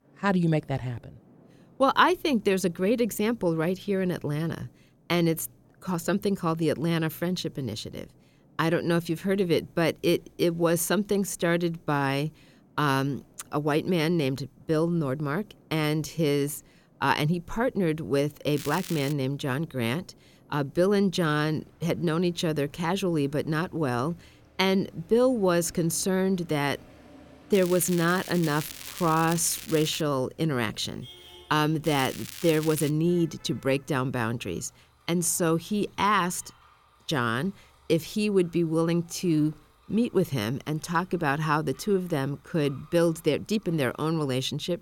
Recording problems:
crackling; noticeable; at 19 s, from 28 to 30 s and from 32 to 33 s; 10 dB below the speech
traffic noise; faint; throughout; 30 dB below the speech

